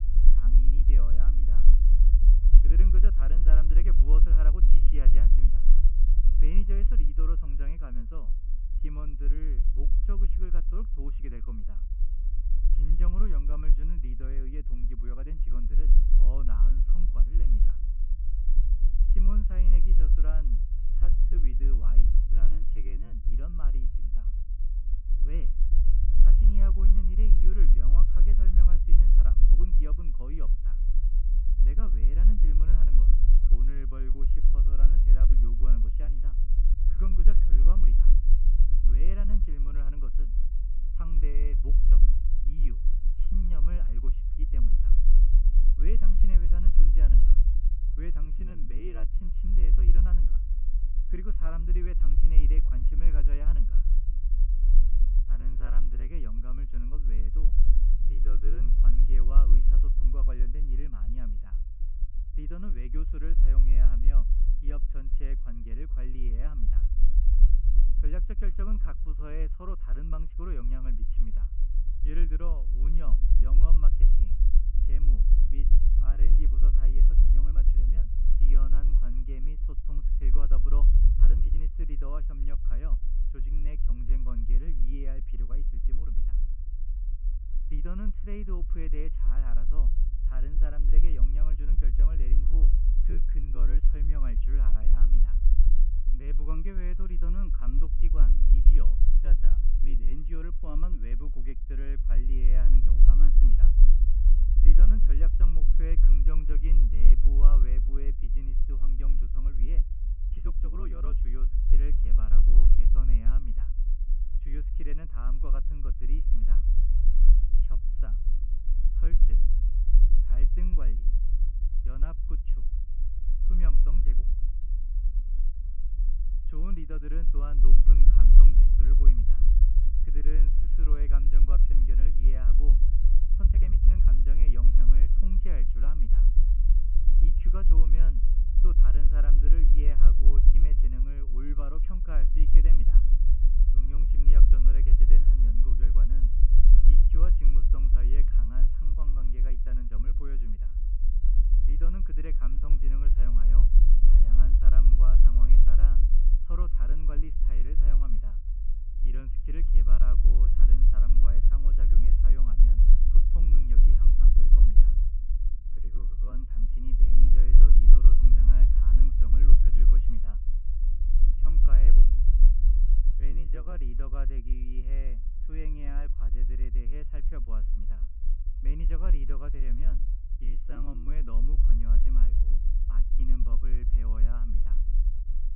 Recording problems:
high frequencies cut off; severe; nothing above 3 kHz
low rumble; loud; throughout; 3 dB below the speech
uneven, jittery; strongly; from 21 s to 3:01

